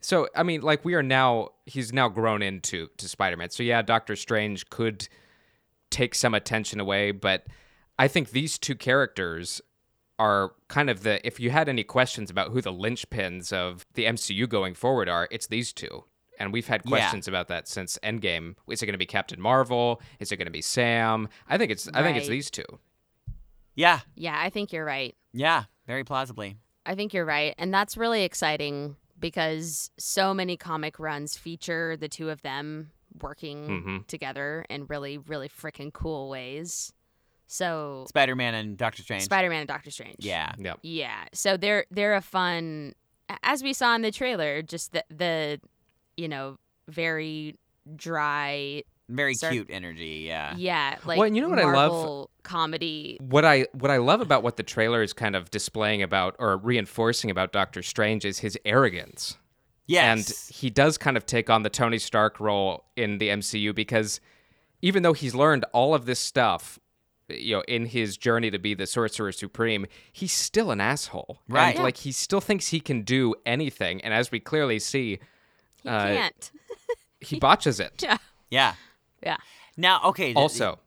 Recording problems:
none

